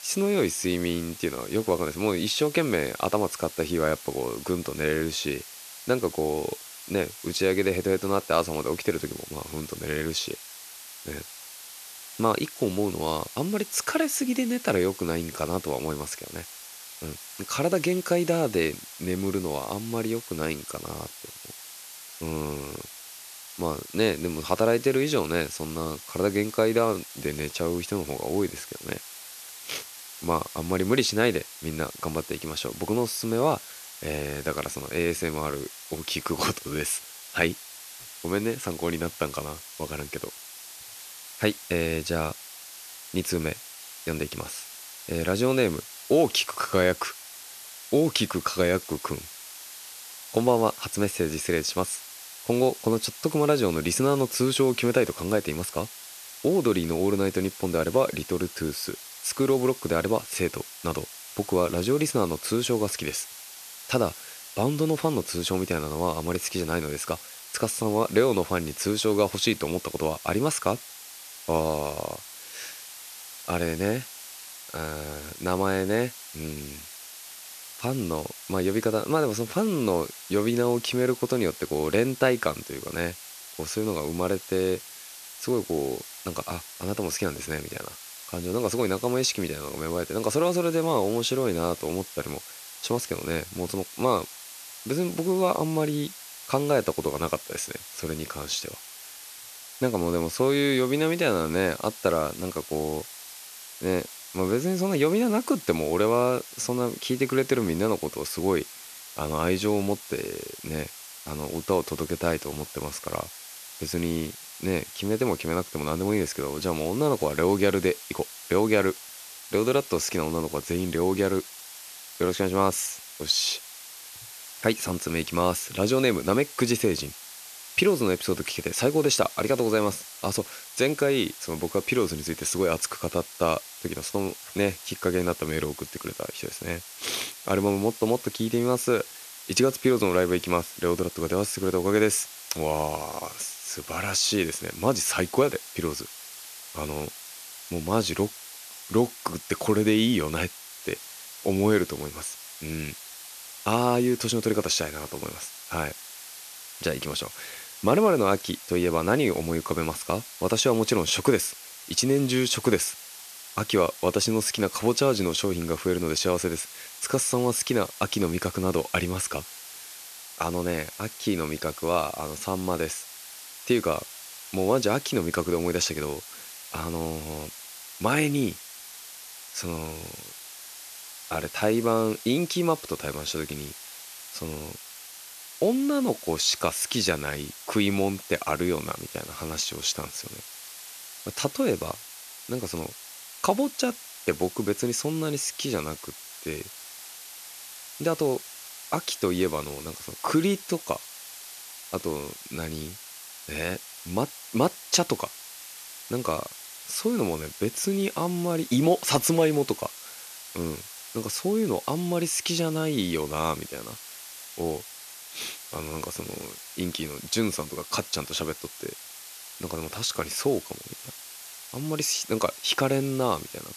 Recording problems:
hiss; noticeable; throughout; 15 dB below the speech

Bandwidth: 14 kHz